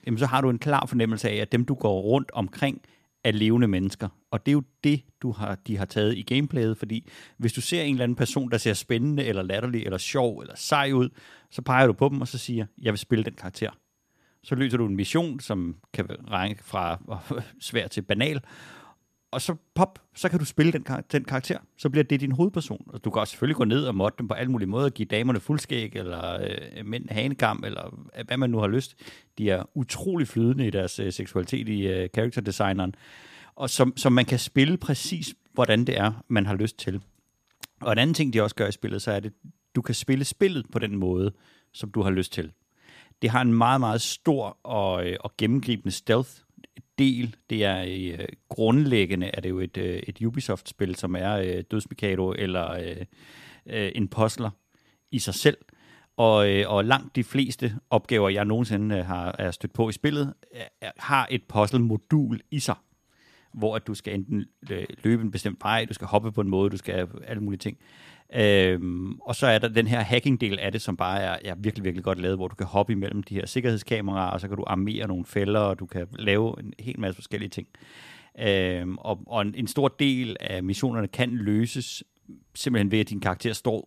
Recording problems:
none

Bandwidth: 14.5 kHz